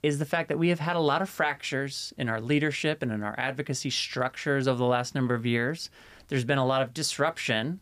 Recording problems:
none

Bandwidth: 15 kHz